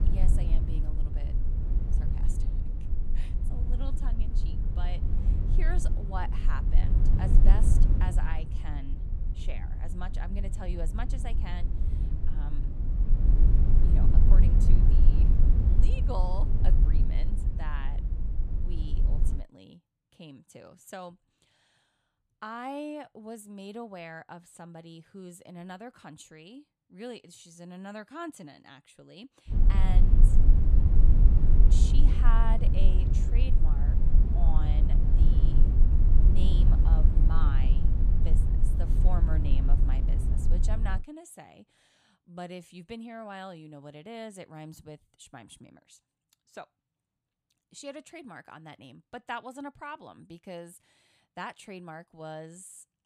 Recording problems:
low rumble; loud; until 19 s and from 30 to 41 s; 2 dB below the speech

